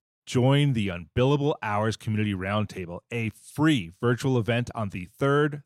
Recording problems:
none

